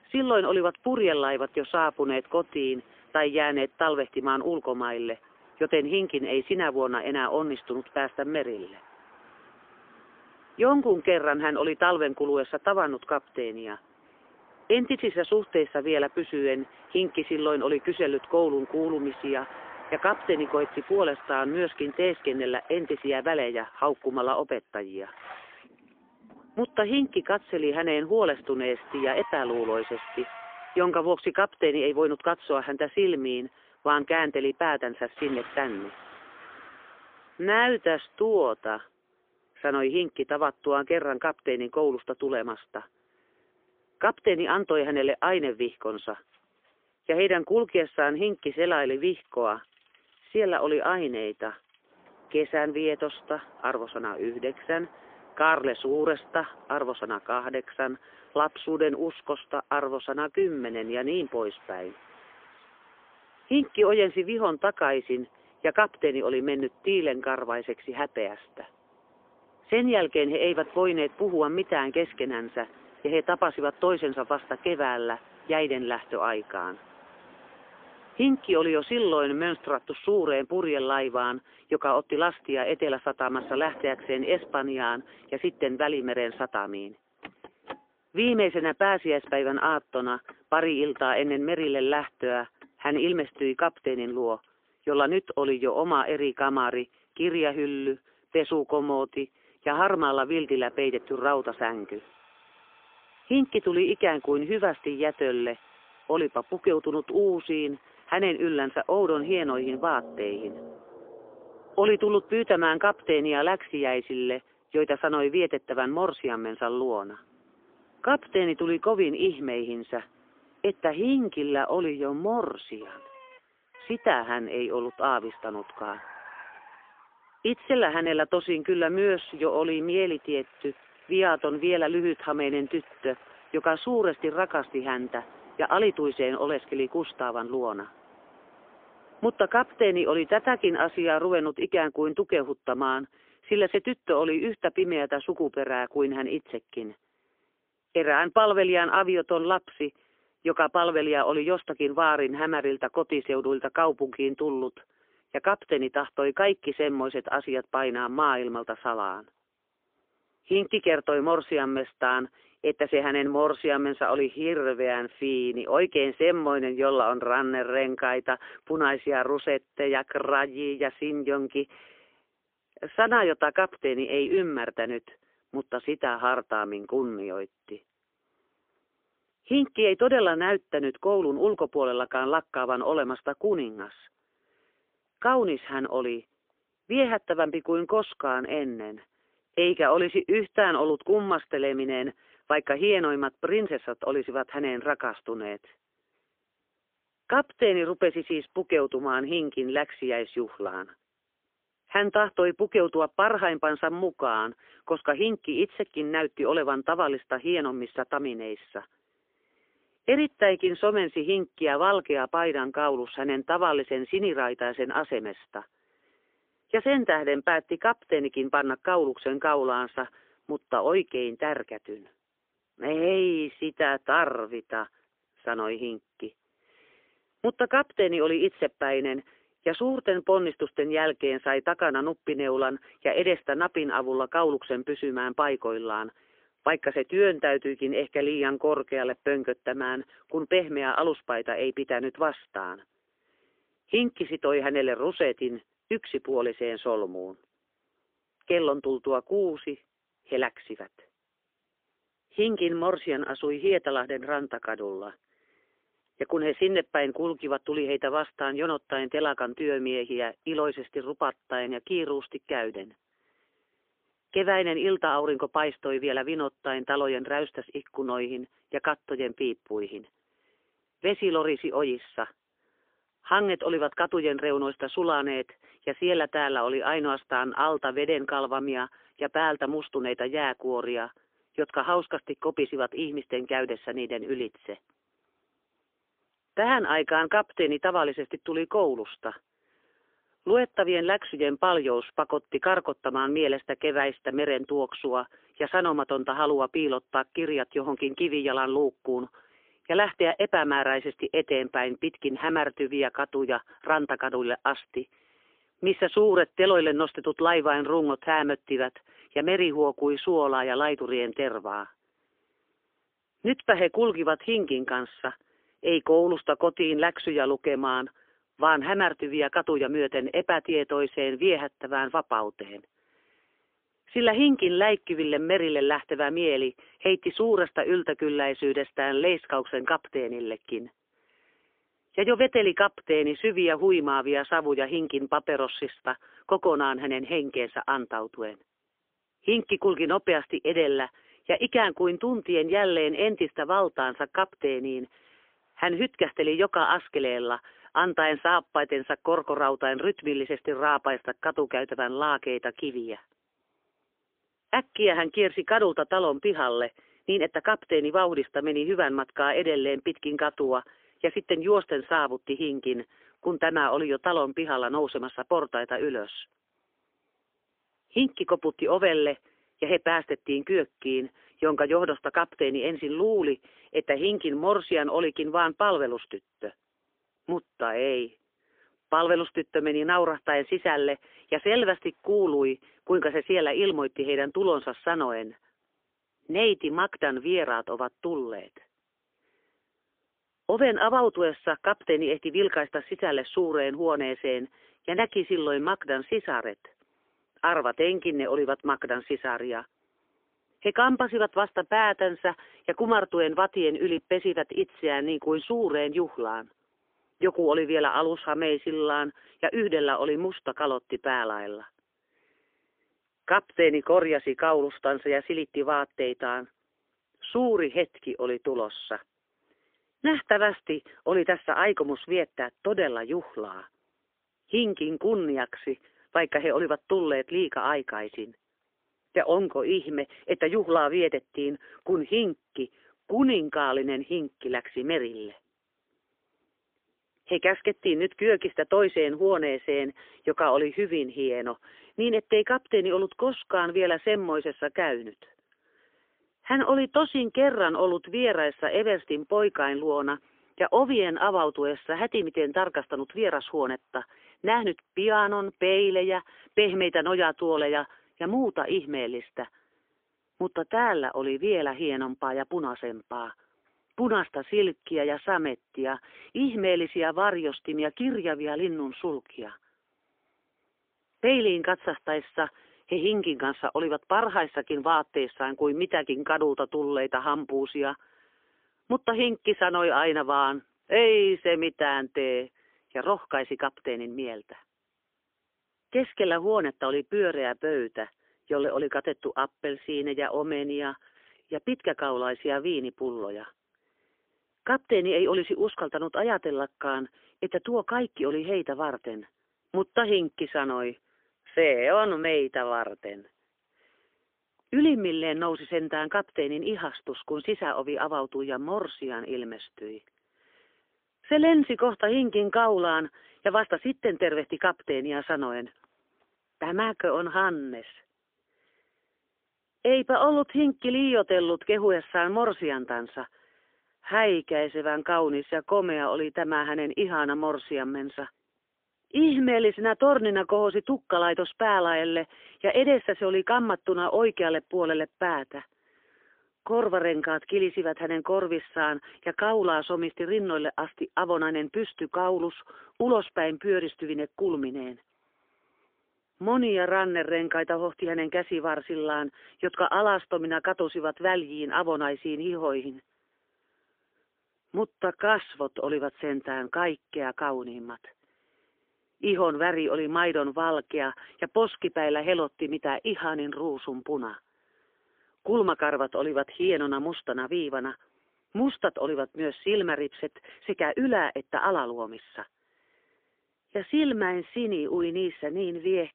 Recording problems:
phone-call audio; poor line; nothing above 3.5 kHz
traffic noise; faint; until 2:21; 25 dB below the speech

